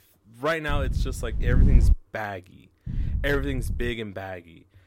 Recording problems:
wind noise on the microphone; occasional gusts; from 0.5 to 2 s and from 3 to 4 s; 10 dB below the speech

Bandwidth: 16 kHz